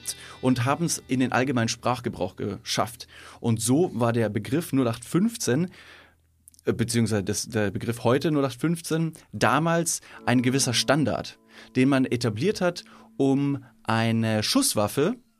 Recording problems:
background music; faint; throughout; 25 dB below the speech

